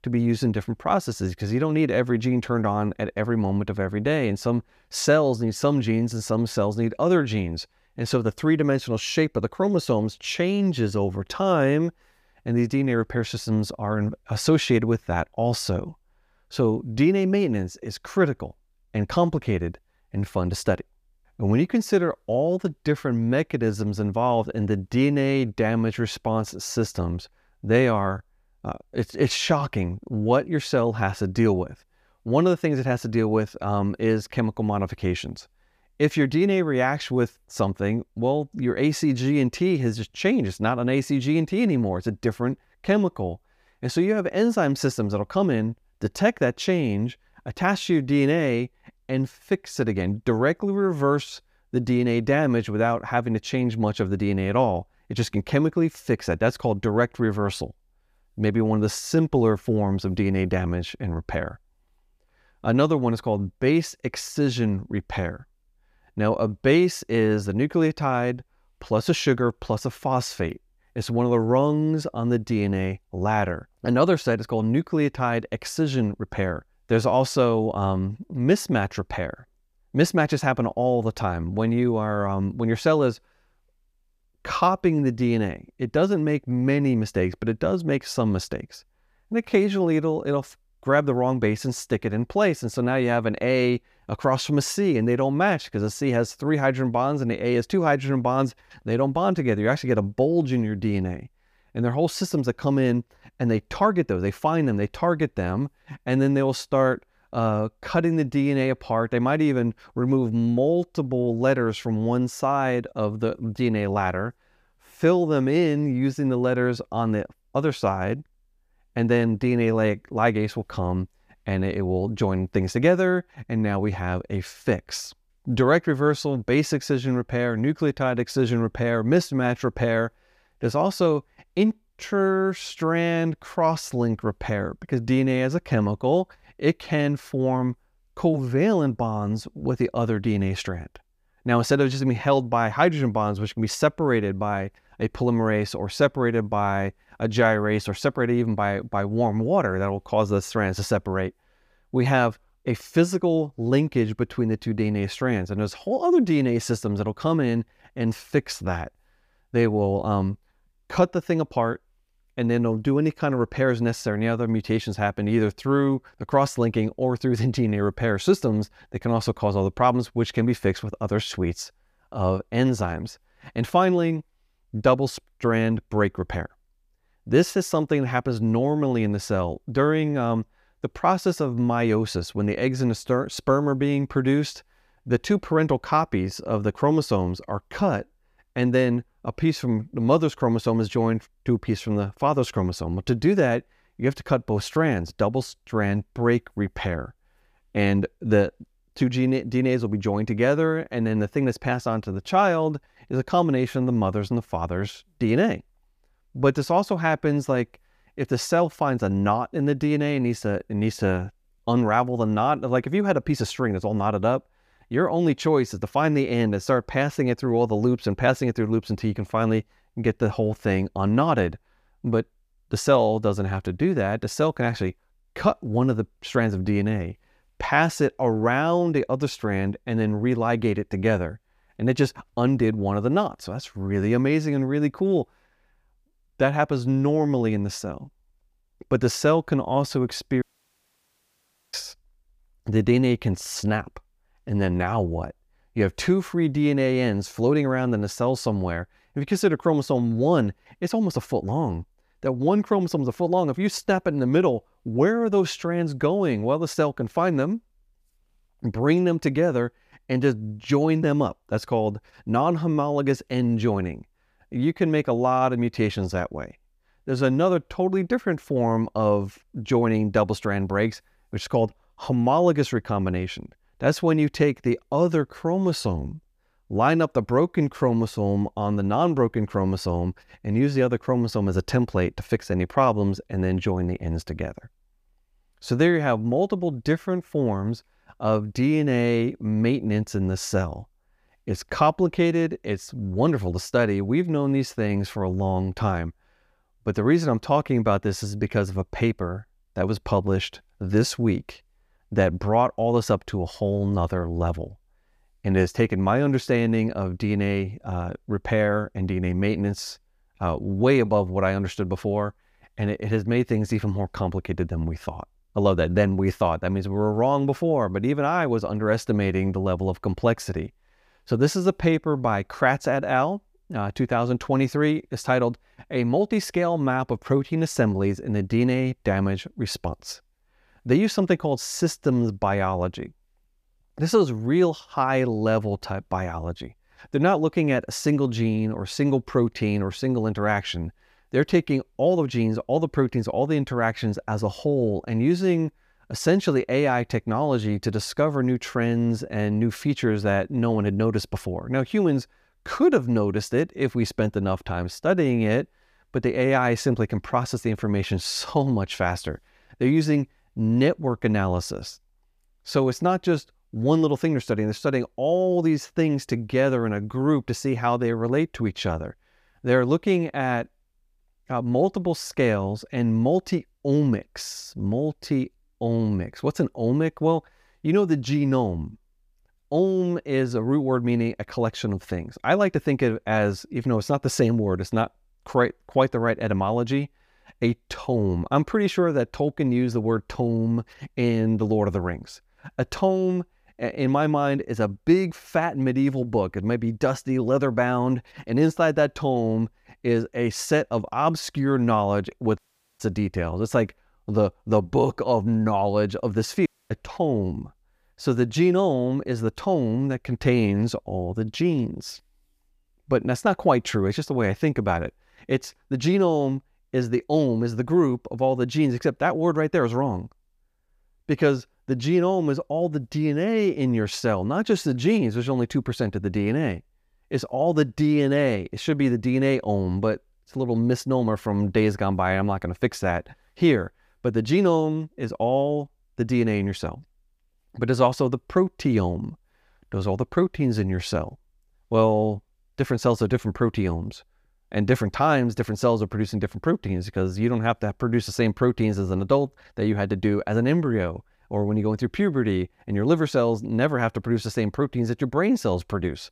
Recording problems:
audio cutting out; at 4:00 for 1.5 s, at 6:43 and at 6:47

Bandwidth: 15 kHz